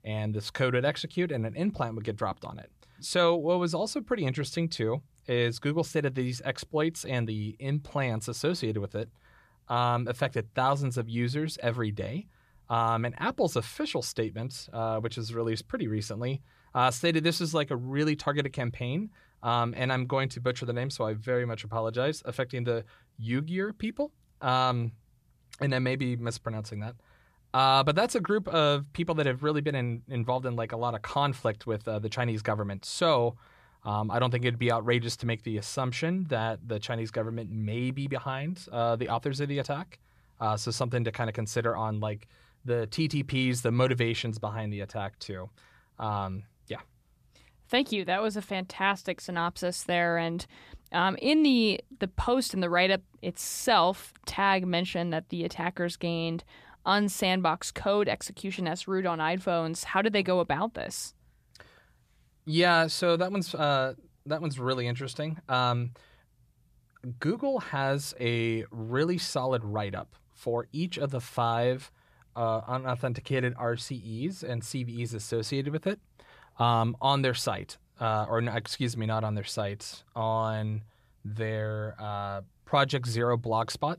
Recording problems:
none

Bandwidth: 14.5 kHz